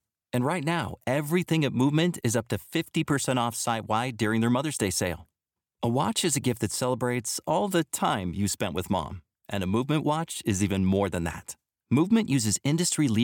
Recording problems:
abrupt cut into speech; at the end

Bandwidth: 18.5 kHz